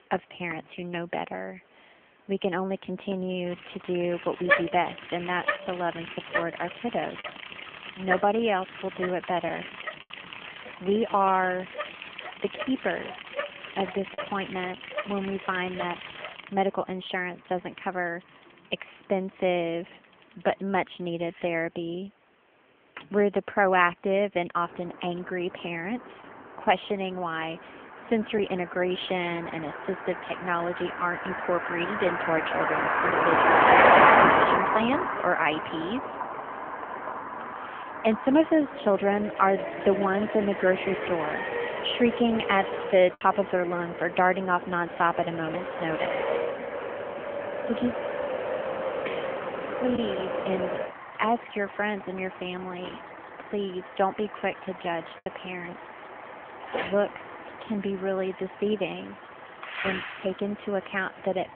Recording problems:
phone-call audio; nothing above 3.5 kHz
traffic noise; very loud; throughout; as loud as the speech
choppy; occasionally; 1% of the speech affected

